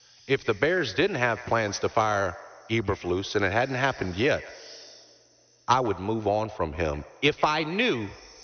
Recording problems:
high frequencies cut off; noticeable; nothing above 6 kHz
echo of what is said; faint; throughout; 150 ms later, 20 dB below the speech
hiss; faint; throughout; 25 dB below the speech

